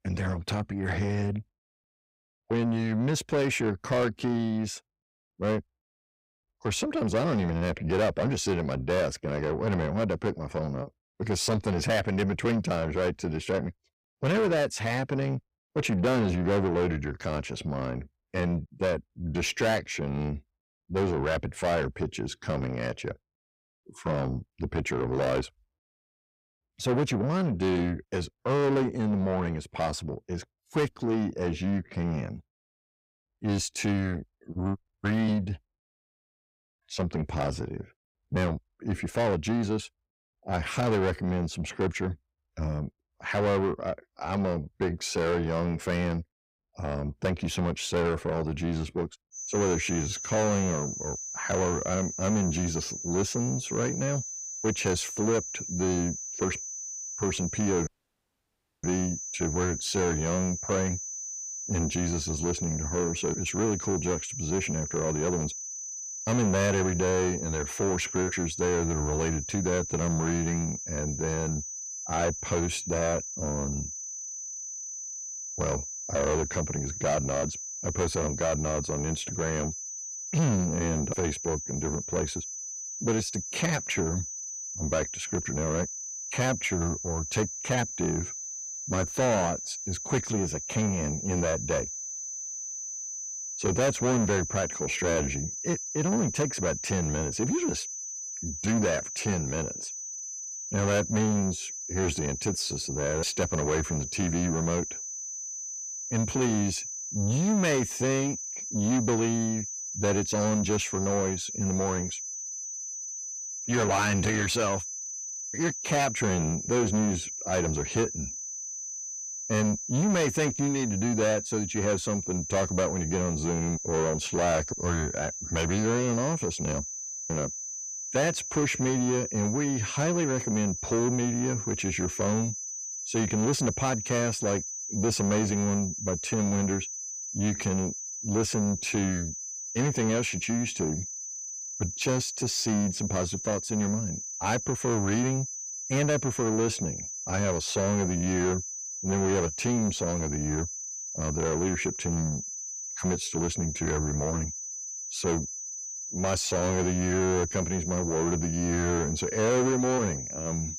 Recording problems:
distortion; heavy; 7 dB below the speech
high-pitched whine; loud; from 49 s on; 6 kHz, 5 dB below the speech
audio cutting out; at 58 s for 1 s

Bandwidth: 15.5 kHz